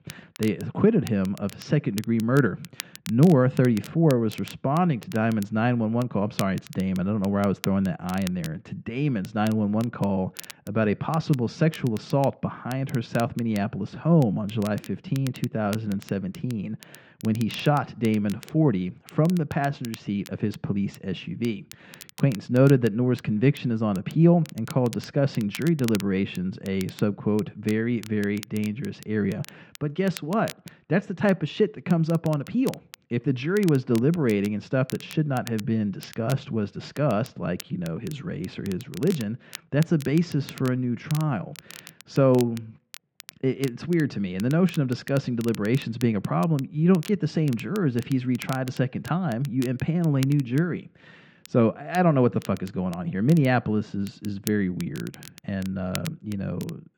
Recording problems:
muffled; very; fading above 3 kHz
crackle, like an old record; noticeable; 20 dB below the speech

